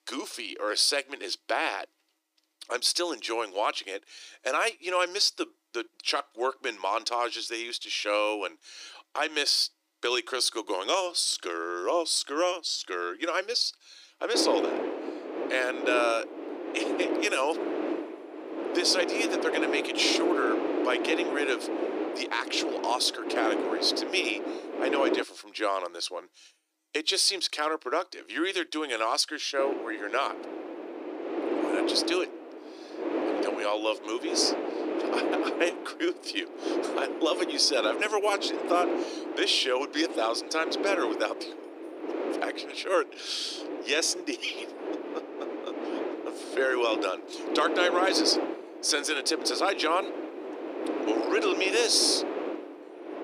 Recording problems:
thin; very; fading below 300 Hz
wind noise on the microphone; heavy; from 14 to 25 s and from 30 s on; 6 dB below the speech

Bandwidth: 15 kHz